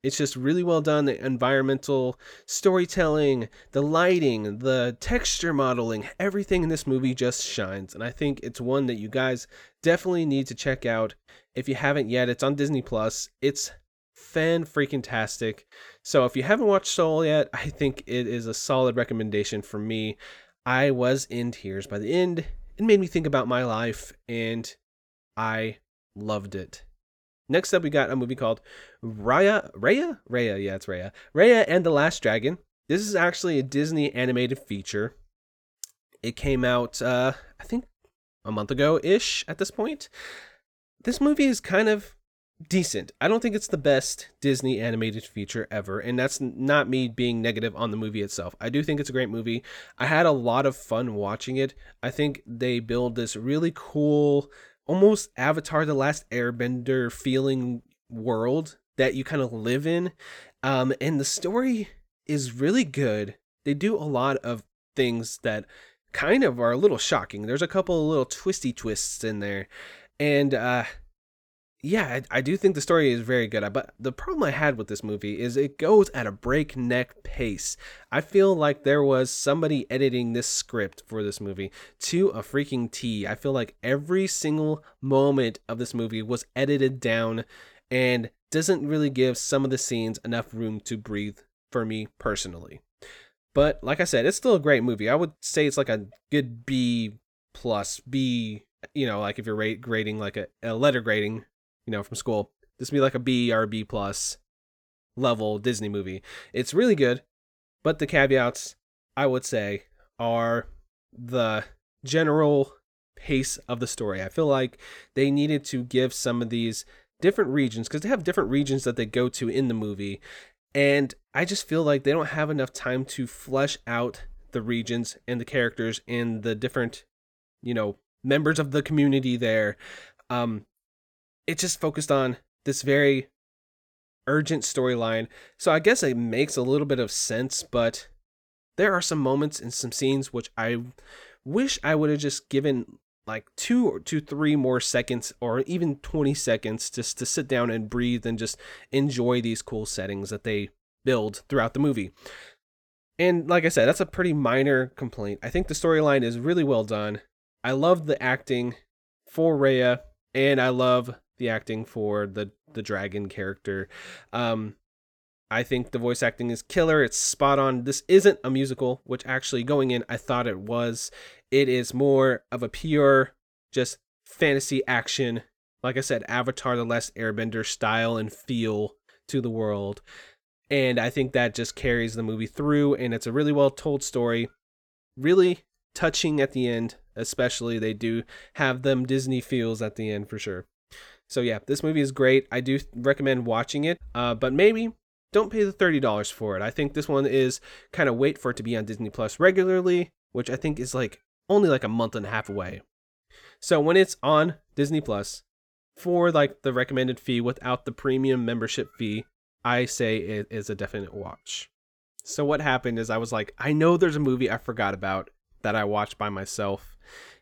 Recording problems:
none

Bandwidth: 18.5 kHz